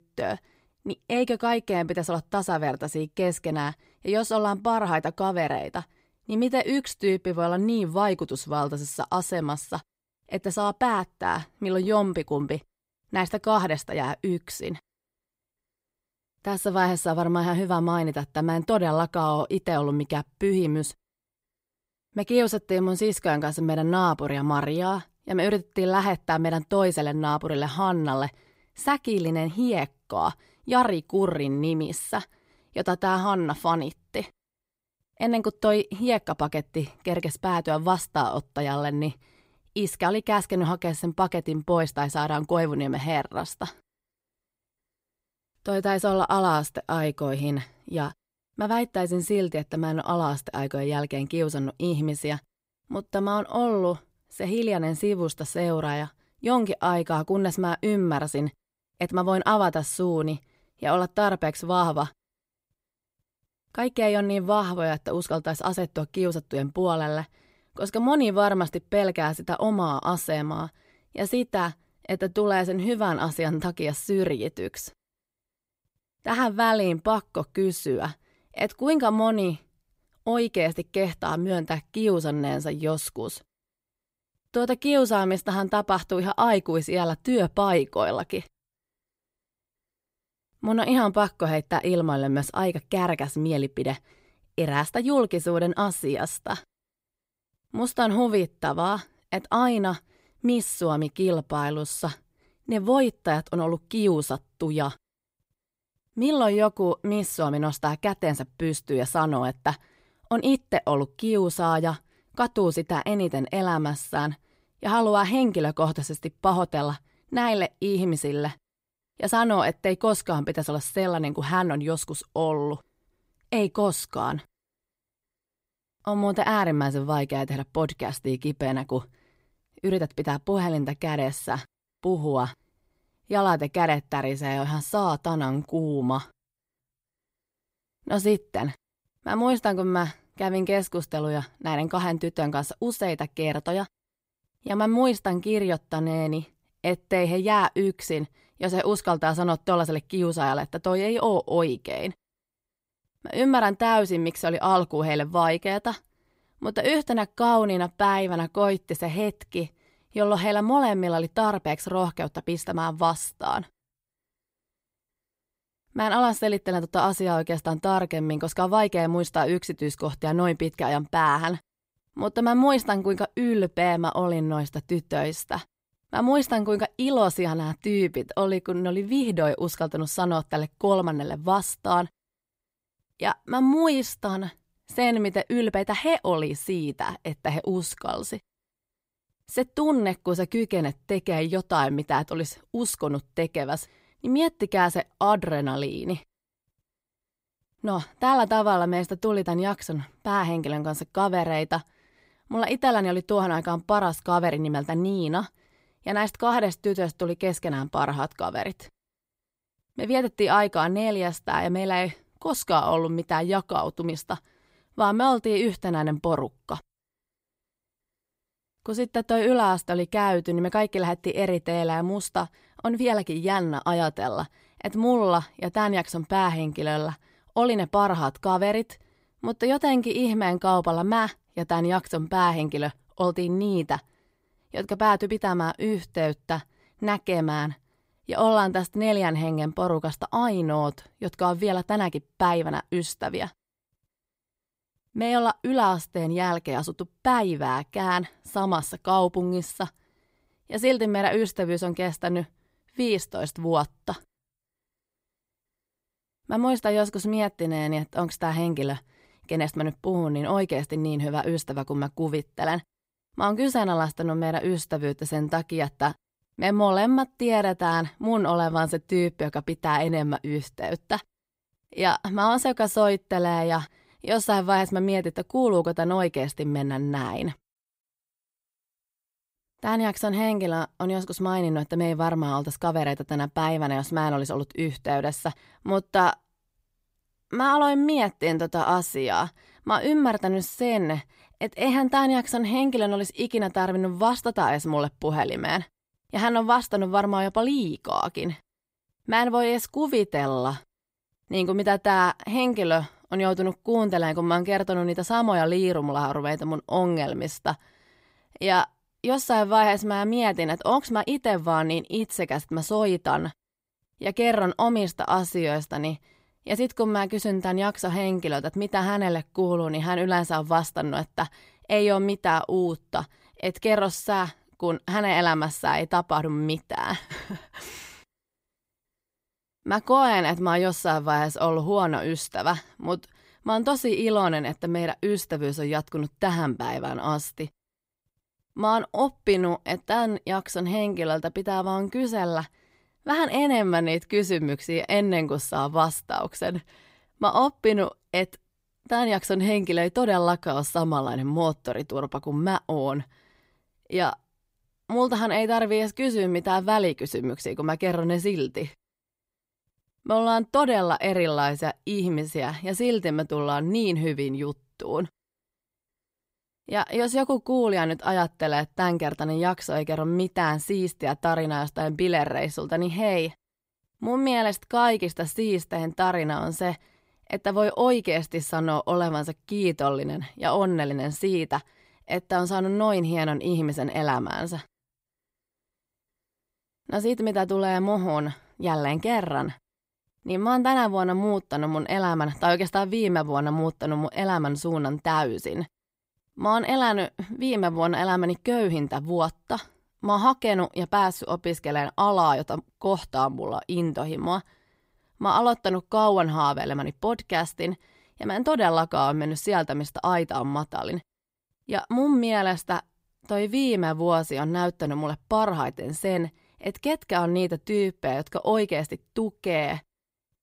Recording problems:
none

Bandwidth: 15.5 kHz